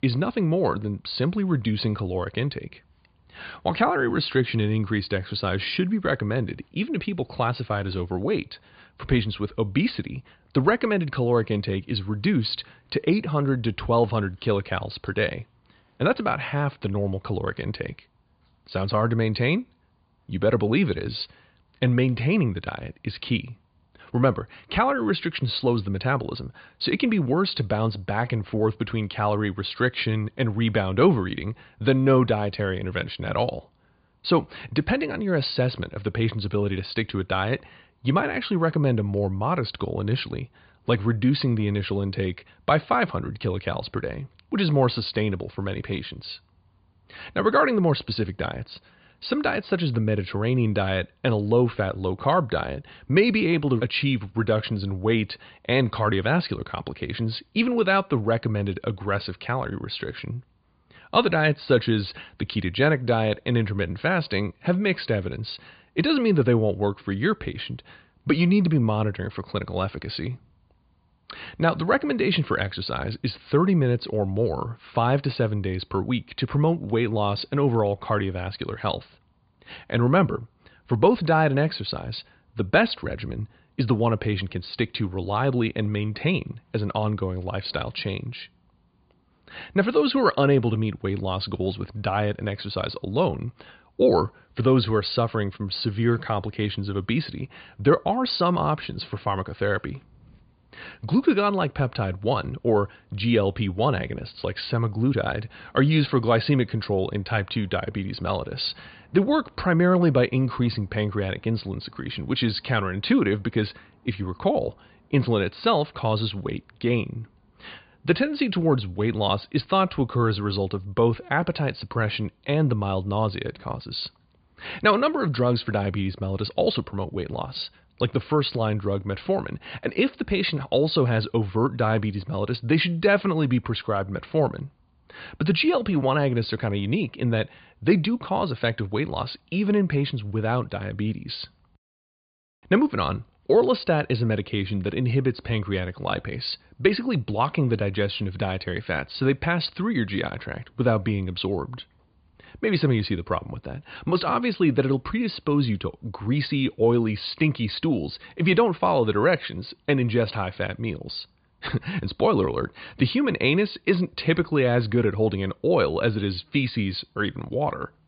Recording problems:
high frequencies cut off; severe; nothing above 5 kHz

